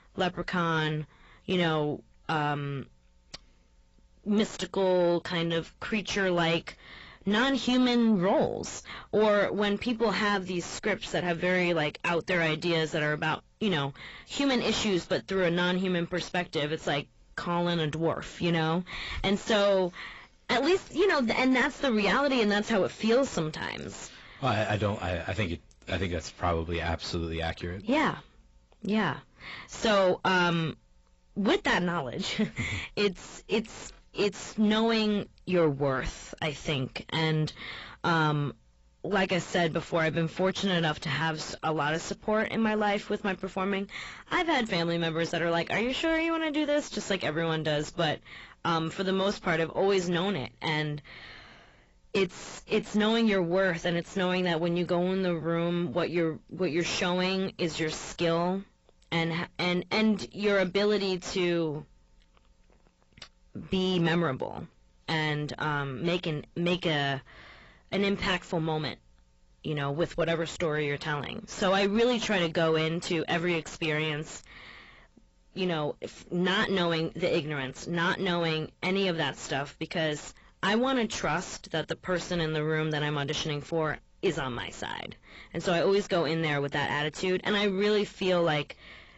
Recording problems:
distortion; heavy; 6 dB below the speech
garbled, watery; badly; nothing above 7.5 kHz

